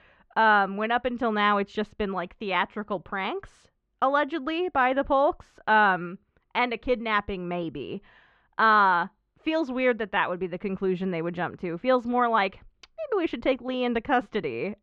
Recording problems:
muffled; slightly; fading above 3 kHz

